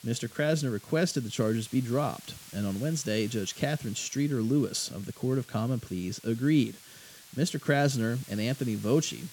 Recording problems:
hiss; noticeable; throughout; 20 dB below the speech

